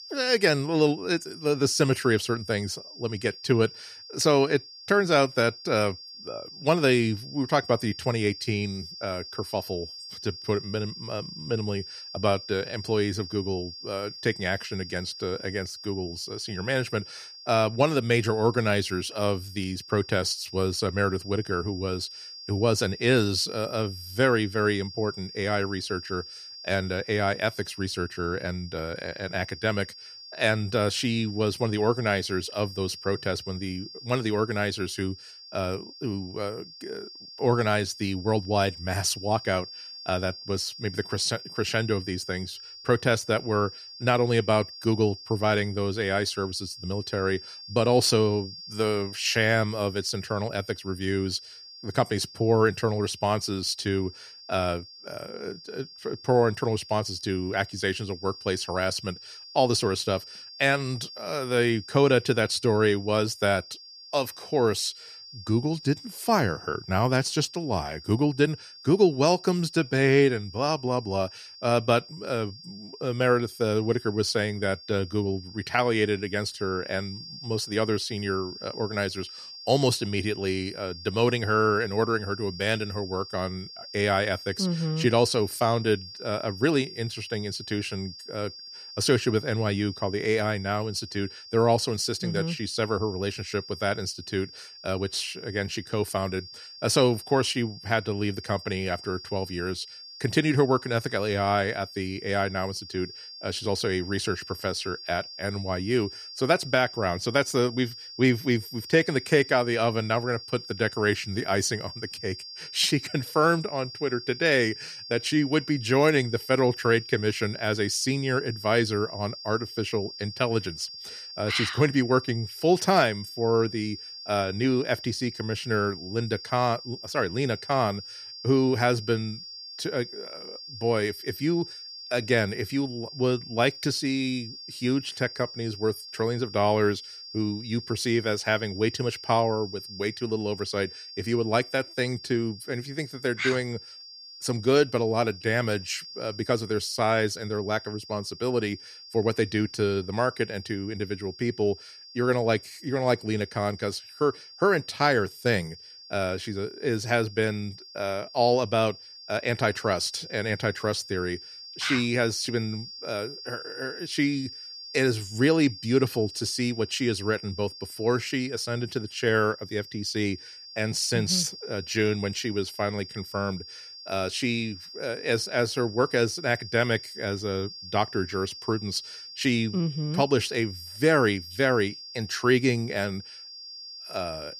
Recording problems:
high-pitched whine; noticeable; throughout; 5 kHz, 15 dB below the speech

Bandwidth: 14.5 kHz